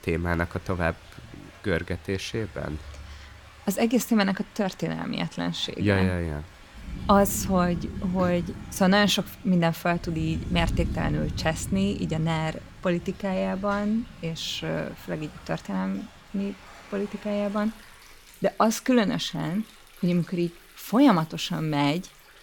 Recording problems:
rain or running water; noticeable; throughout; 15 dB below the speech

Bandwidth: 17.5 kHz